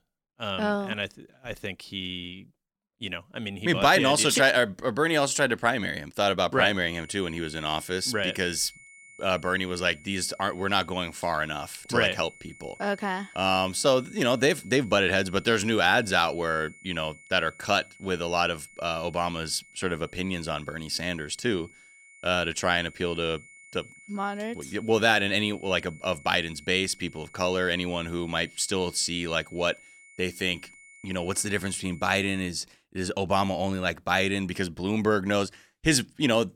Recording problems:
high-pitched whine; faint; from 7 to 32 s; 2 kHz, 25 dB below the speech

